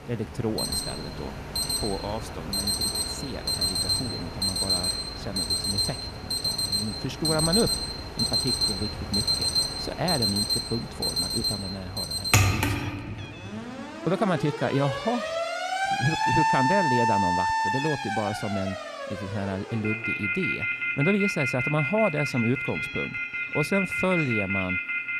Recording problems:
alarms or sirens; very loud; throughout; 4 dB above the speech
animal sounds; noticeable; throughout; 15 dB below the speech
background music; faint; throughout; 25 dB below the speech

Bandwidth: 14.5 kHz